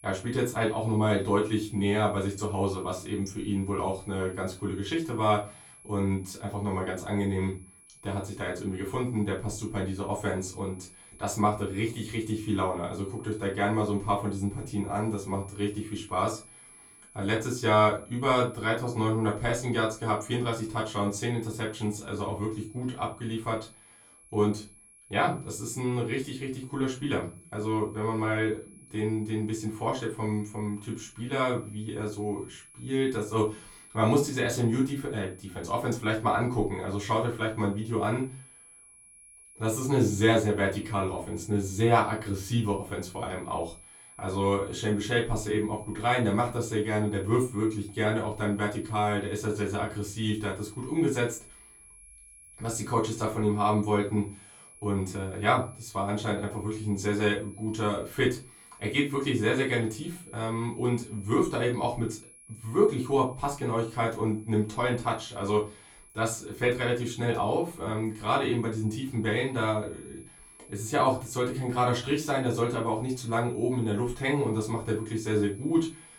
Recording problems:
off-mic speech; far
room echo; very slight; dies away in 0.2 s
high-pitched whine; faint; throughout; 10.5 kHz, 20 dB below the speech

